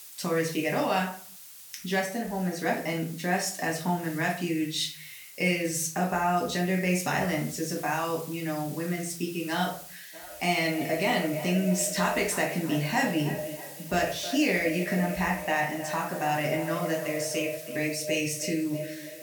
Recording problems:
echo of what is said; strong; from 10 s on; 320 ms later, 9 dB below the speech
off-mic speech; far
room echo; slight; dies away in 0.4 s
hiss; noticeable; throughout; 15 dB below the speech

